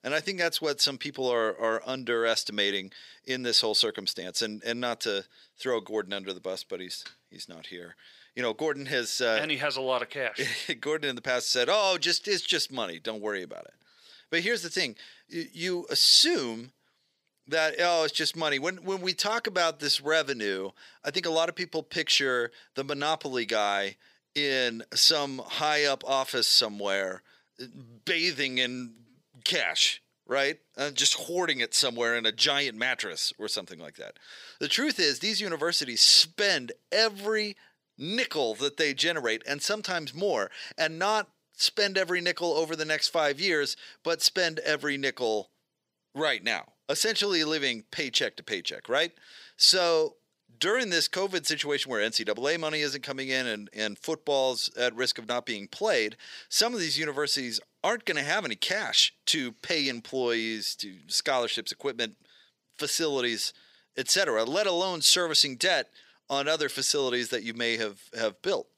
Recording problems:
thin; somewhat; fading below 400 Hz

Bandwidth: 15.5 kHz